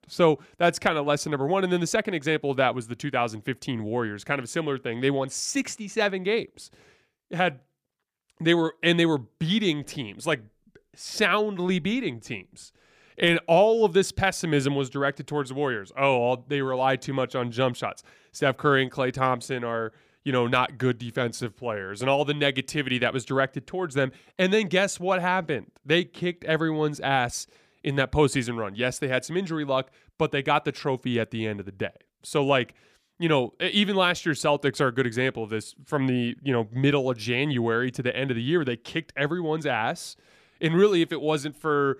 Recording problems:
none

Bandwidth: 15 kHz